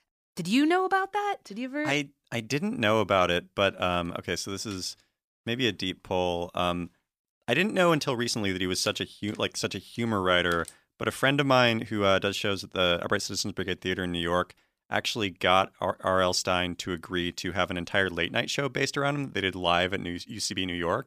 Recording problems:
none

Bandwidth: 15 kHz